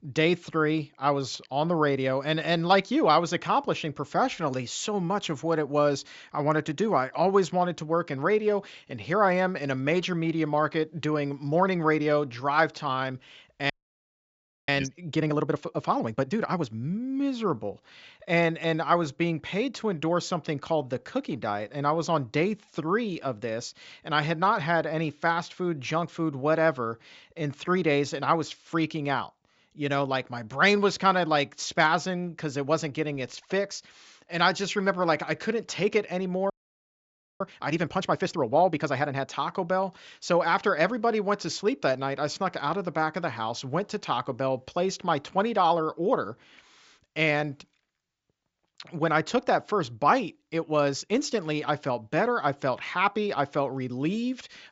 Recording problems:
high frequencies cut off; noticeable; nothing above 7.5 kHz
audio freezing; at 14 s for 1 s and at 37 s for 1 s

